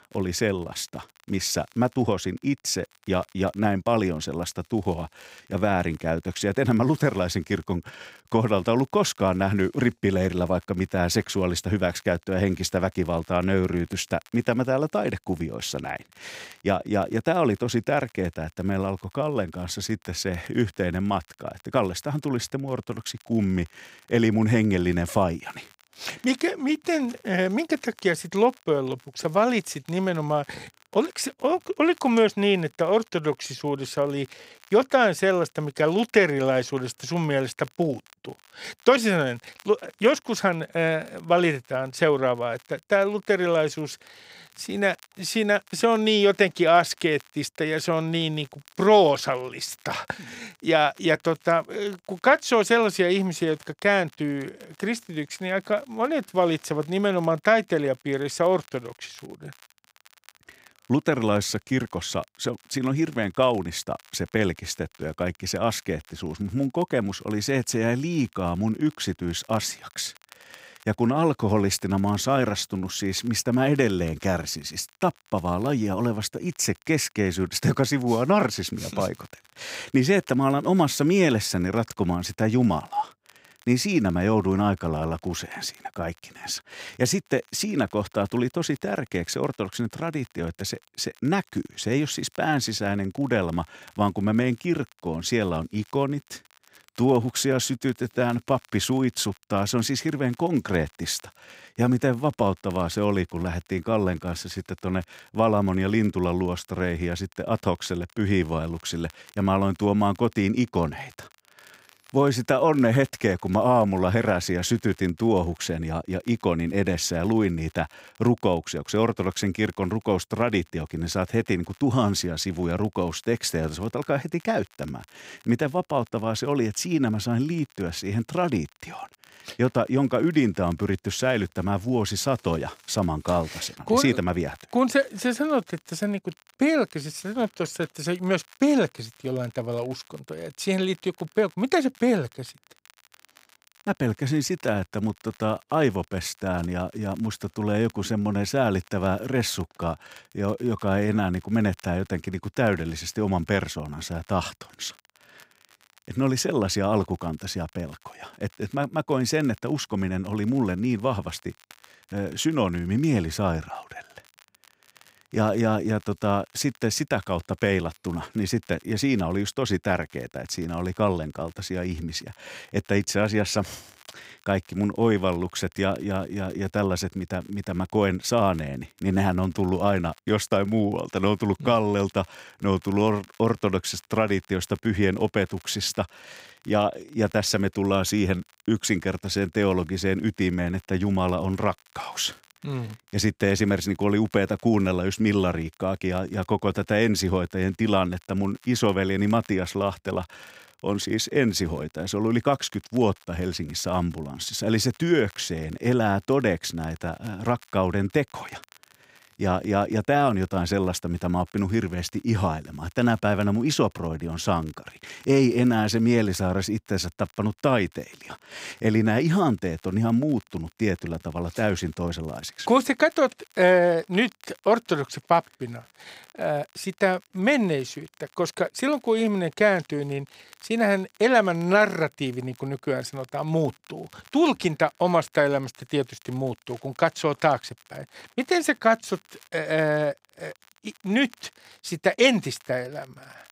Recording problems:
crackle, like an old record; faint; 30 dB below the speech

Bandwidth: 15.5 kHz